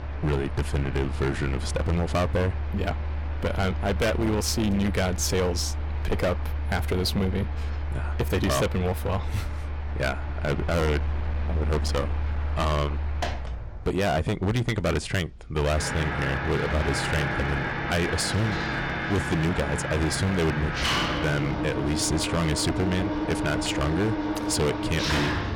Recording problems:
distortion; heavy; 15% of the sound clipped
machinery noise; loud; throughout; 3 dB below the speech

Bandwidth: 17 kHz